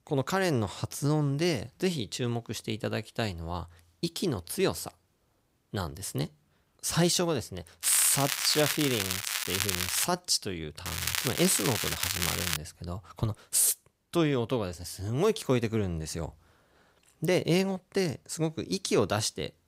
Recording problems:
crackling; loud; from 8 to 10 s and from 11 to 13 s; 1 dB below the speech

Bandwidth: 15.5 kHz